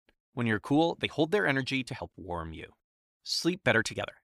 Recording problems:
uneven, jittery; strongly

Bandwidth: 15 kHz